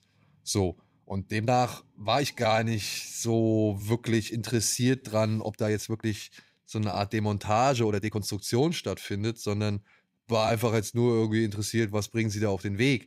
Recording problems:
uneven, jittery; strongly; from 1 to 11 s

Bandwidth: 15.5 kHz